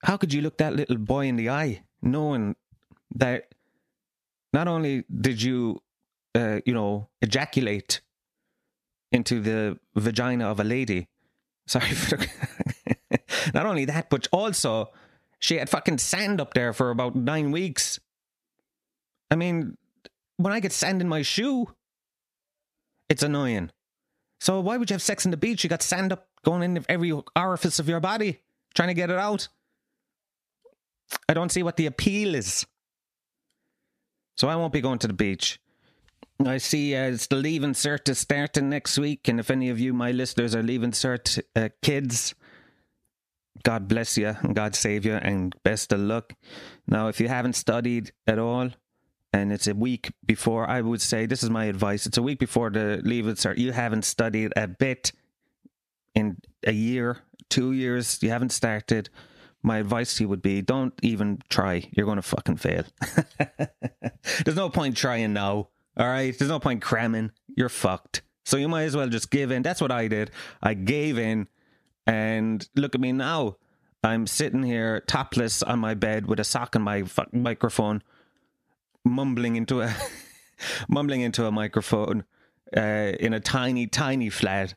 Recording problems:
squashed, flat; somewhat

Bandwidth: 14.5 kHz